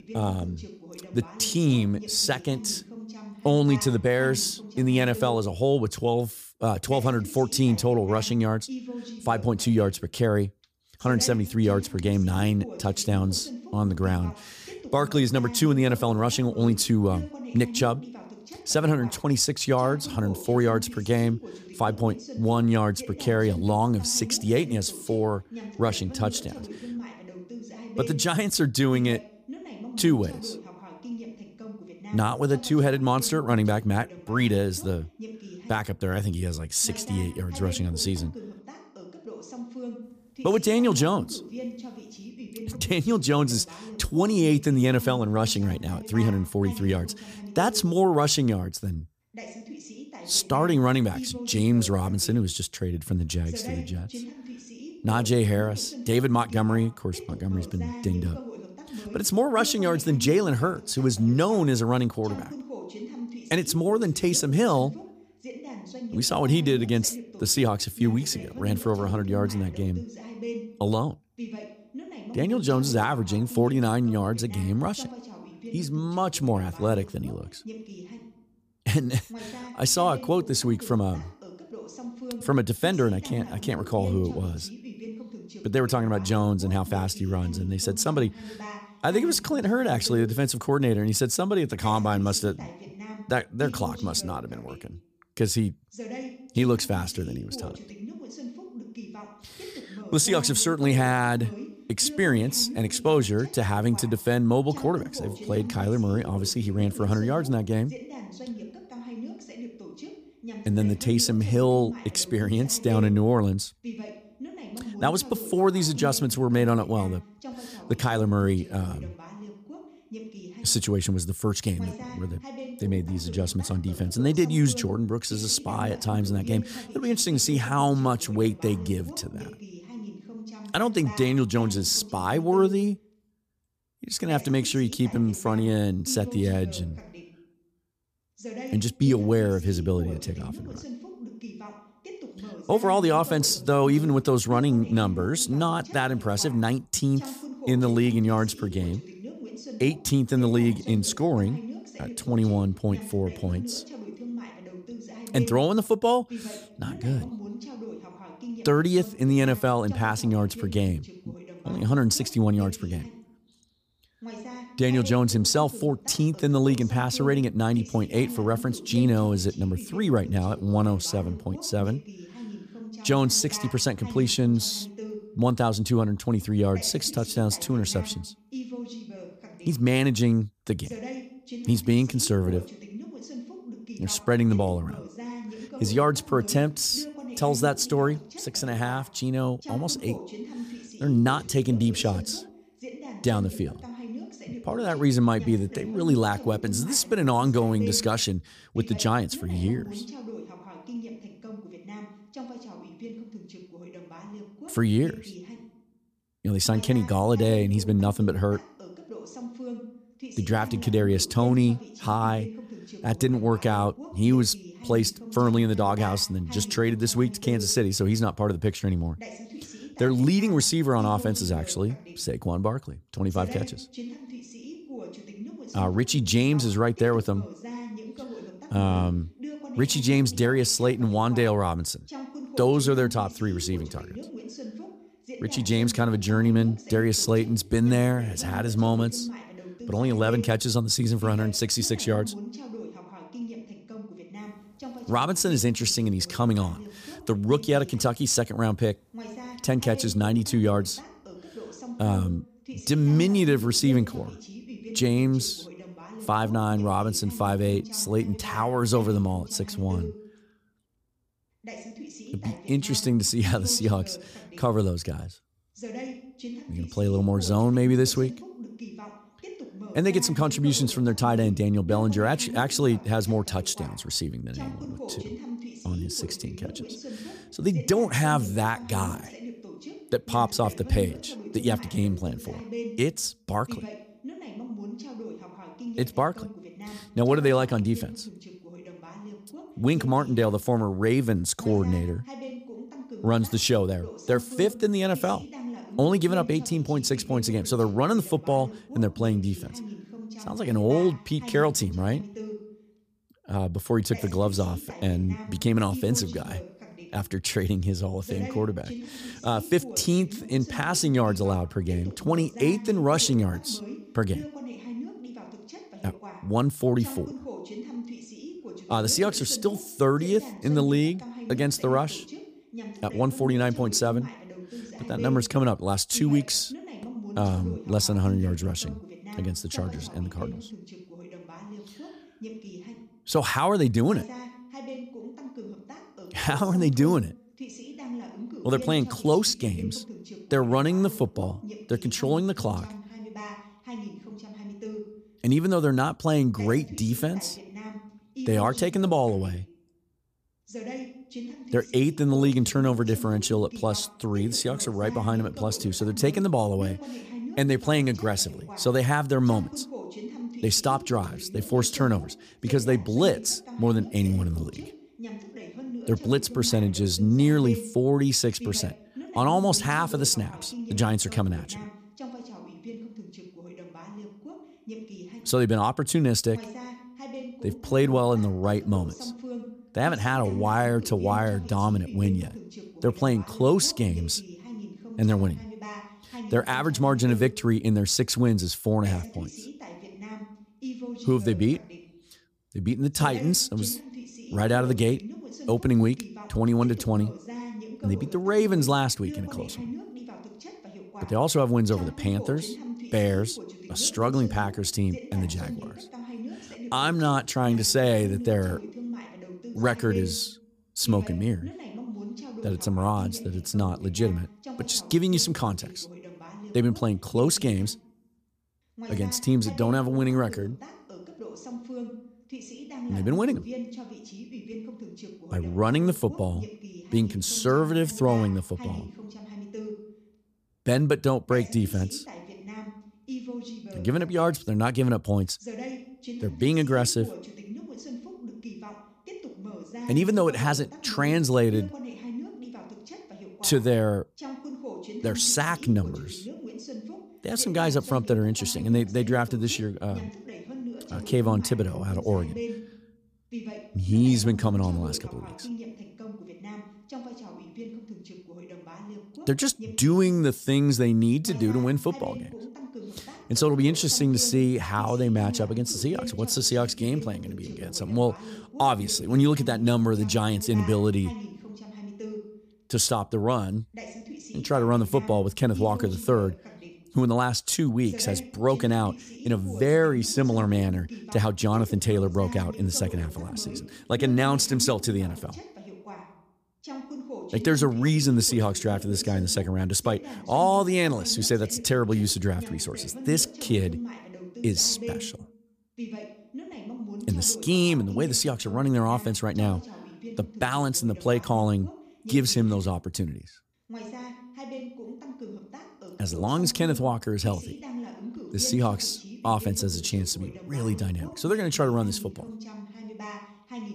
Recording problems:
voice in the background; noticeable; throughout; 15 dB below the speech

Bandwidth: 15 kHz